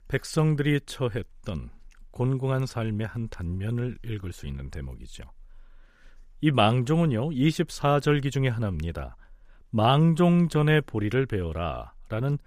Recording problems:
none

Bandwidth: 15 kHz